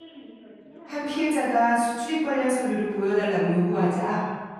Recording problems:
room echo; strong; dies away in 1.2 s
off-mic speech; far
background chatter; faint; throughout; 3 voices, 20 dB below the speech

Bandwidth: 15 kHz